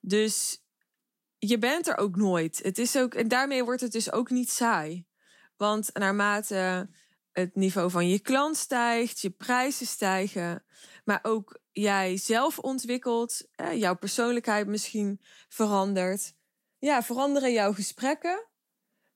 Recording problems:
none

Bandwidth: 18.5 kHz